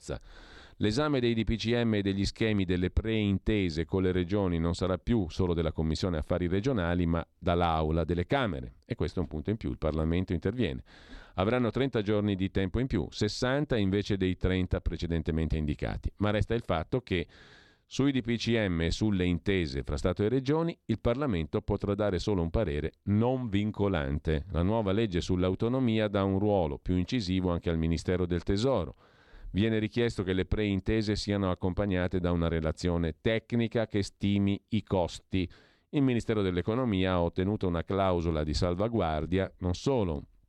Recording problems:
none

